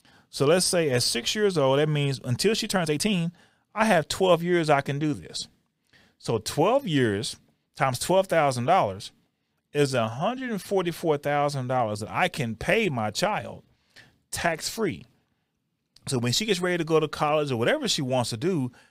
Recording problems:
uneven, jittery; strongly; from 2.5 to 17 s

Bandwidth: 15.5 kHz